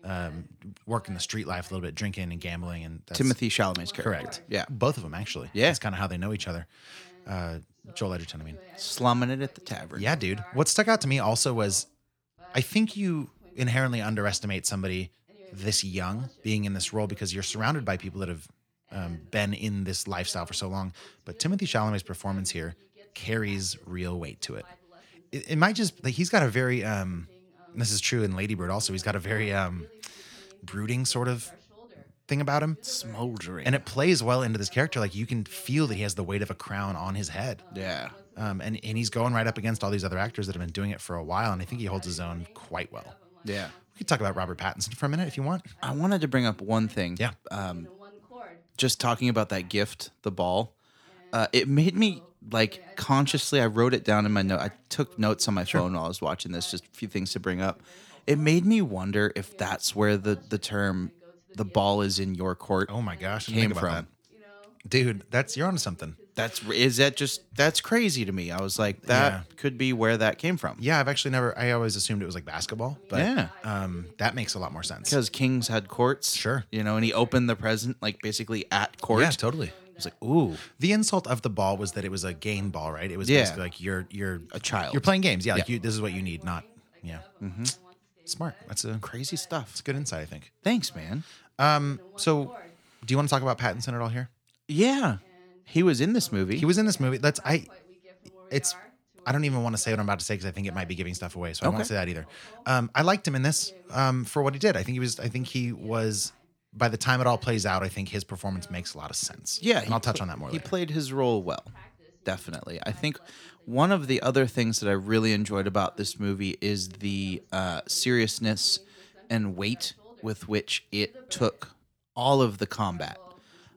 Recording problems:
voice in the background; faint; throughout; 25 dB below the speech

